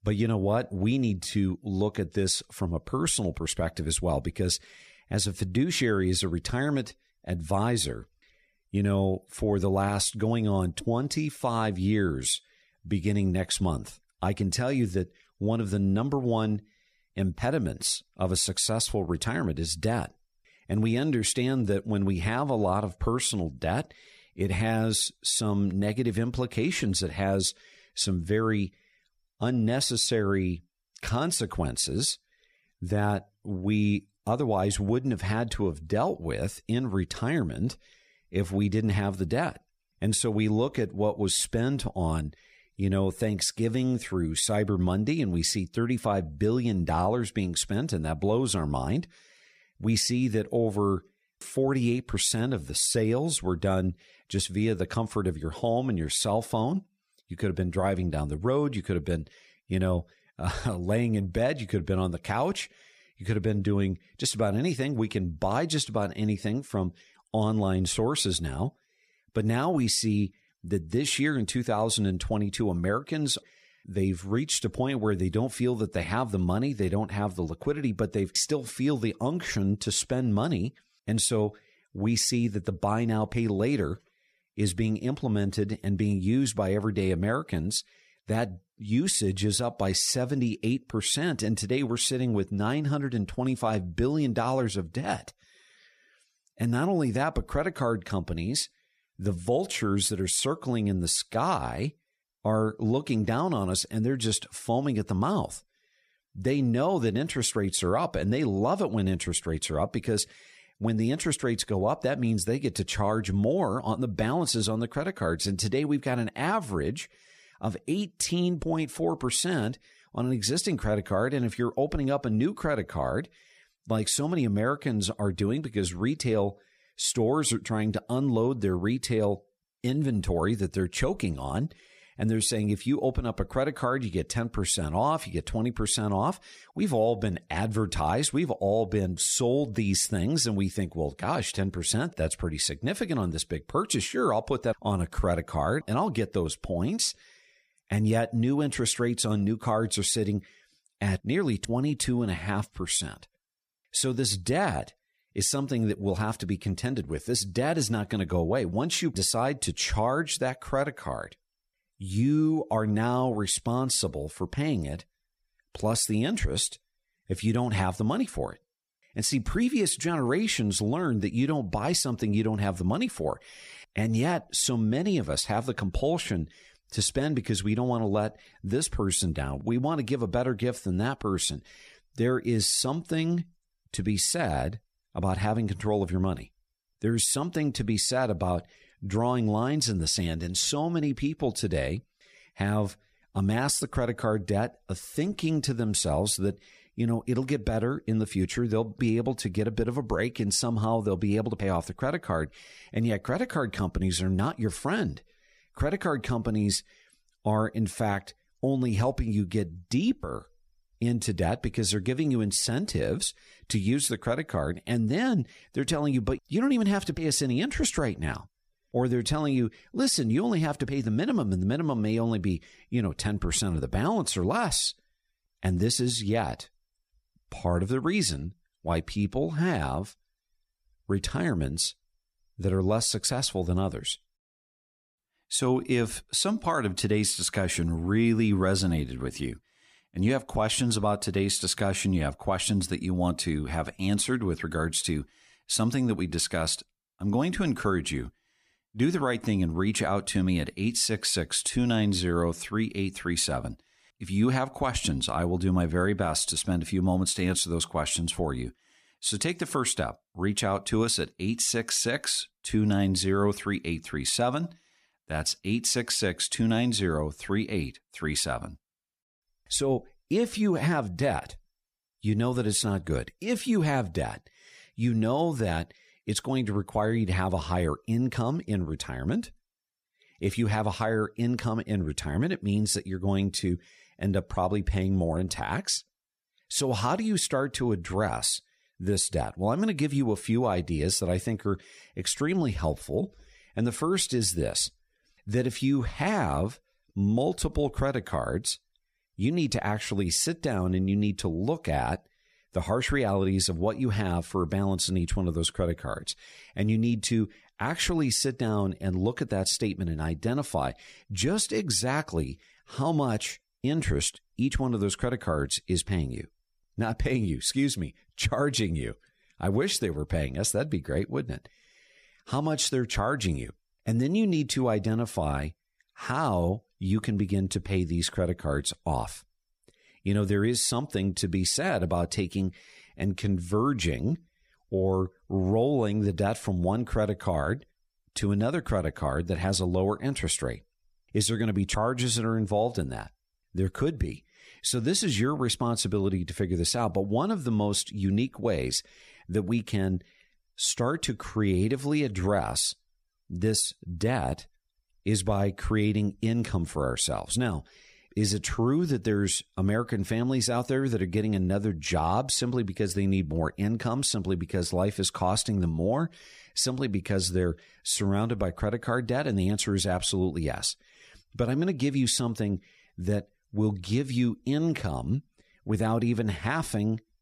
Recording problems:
none

